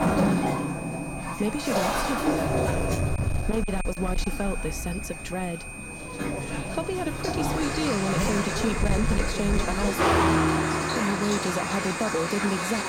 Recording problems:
distortion; slight; 7% of the sound clipped
rain or running water; very loud; throughout; as loud as the speech
traffic noise; very loud; from 6 s on; 2 dB above the speech
high-pitched whine; loud; throughout; 2.5 kHz, 8 dB below the speech

